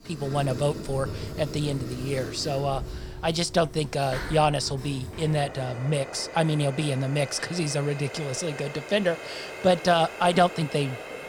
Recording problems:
household noises; noticeable; throughout; 10 dB below the speech

